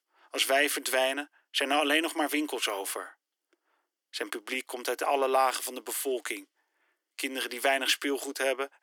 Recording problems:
thin; somewhat; fading below 300 Hz

